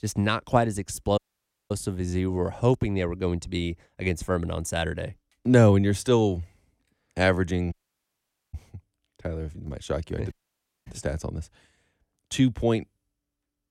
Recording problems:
audio cutting out; at 1 s for 0.5 s, at 7.5 s for 1 s and at 10 s for 0.5 s

